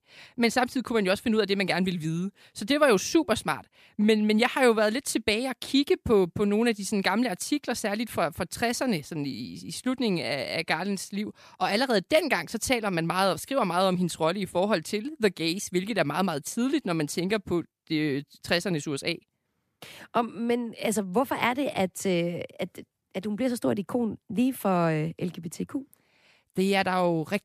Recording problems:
none

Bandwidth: 14.5 kHz